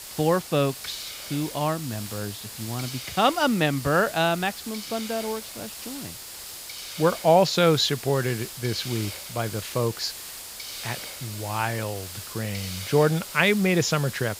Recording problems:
high frequencies cut off; noticeable; nothing above 7 kHz
hiss; noticeable; throughout; 10 dB below the speech

